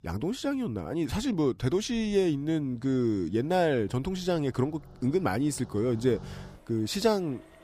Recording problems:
traffic noise; faint; throughout; 25 dB below the speech

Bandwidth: 15 kHz